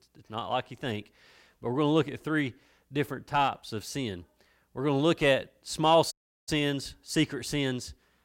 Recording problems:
audio cutting out; at 6 s

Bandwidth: 16.5 kHz